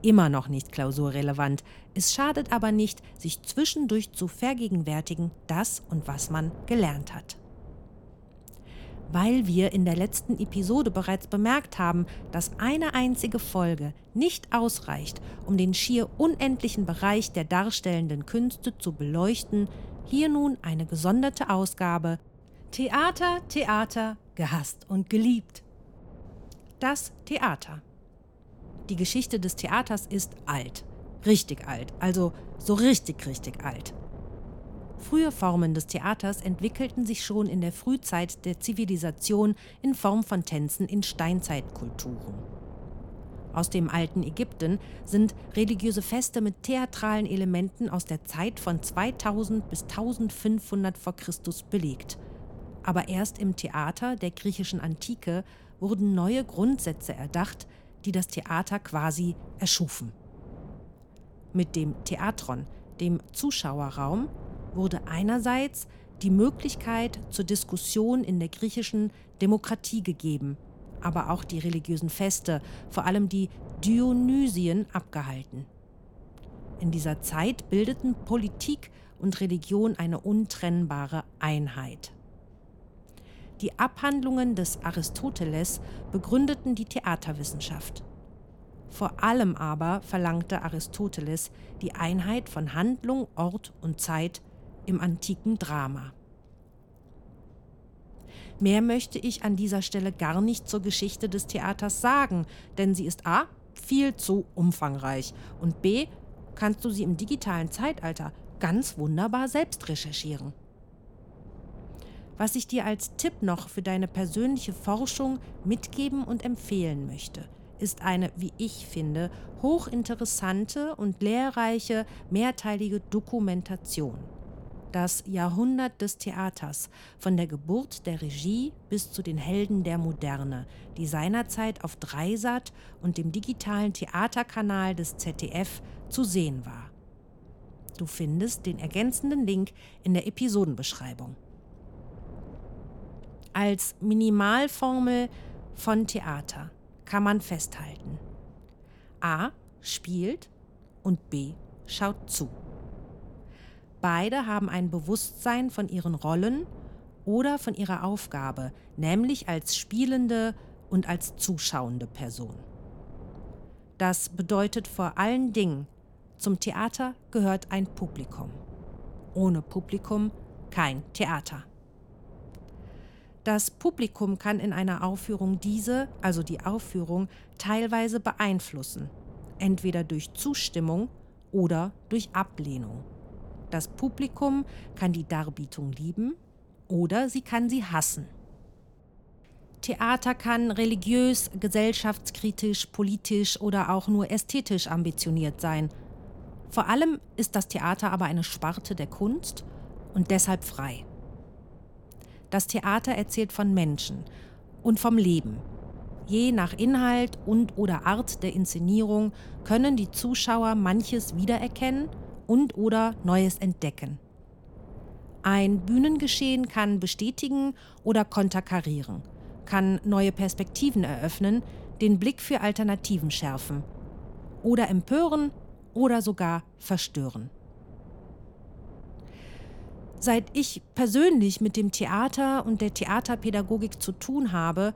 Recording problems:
wind noise on the microphone; occasional gusts; 25 dB below the speech

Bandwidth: 17.5 kHz